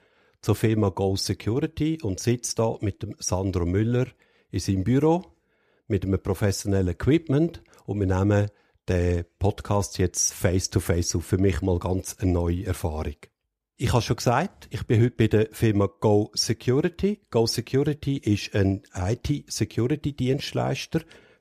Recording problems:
none

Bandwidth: 14.5 kHz